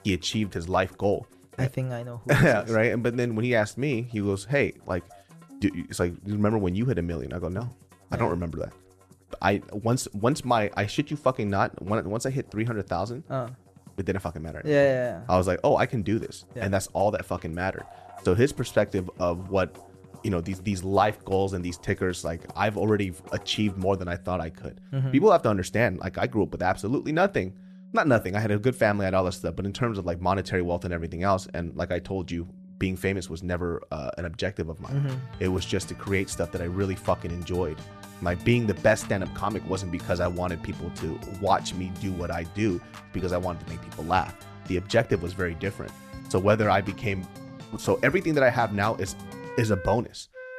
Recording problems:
background music; noticeable; throughout; 20 dB below the speech

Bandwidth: 14.5 kHz